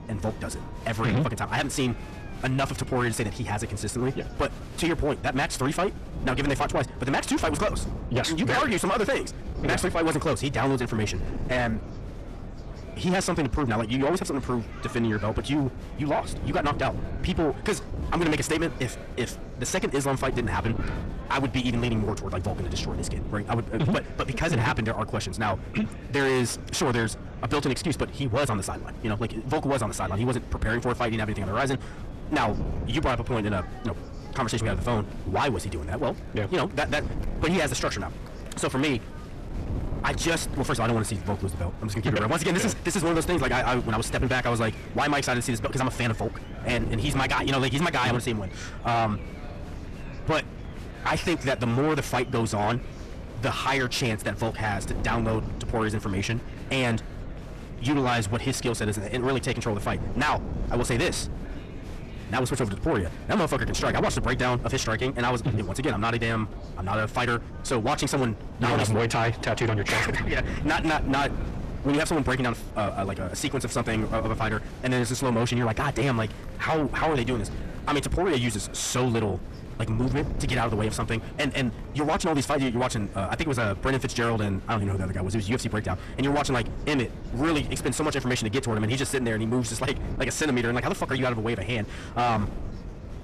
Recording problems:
distortion; heavy; 6 dB below the speech
wrong speed, natural pitch; too fast; 1.5 times normal speed
wind noise on the microphone; occasional gusts; 15 dB below the speech
murmuring crowd; faint; throughout; 20 dB below the speech

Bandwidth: 13.5 kHz